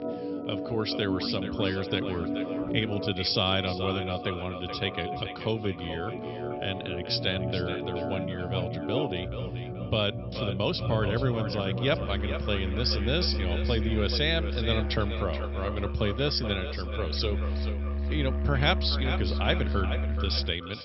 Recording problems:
echo of what is said; strong; throughout; 430 ms later, 10 dB below the speech
high frequencies cut off; noticeable; nothing above 5.5 kHz
background music; loud; throughout; 3 dB below the speech

